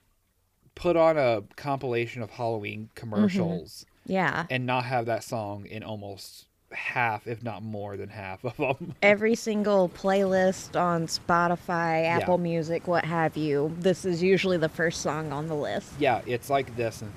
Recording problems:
rain or running water; faint; throughout; 20 dB below the speech

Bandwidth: 15 kHz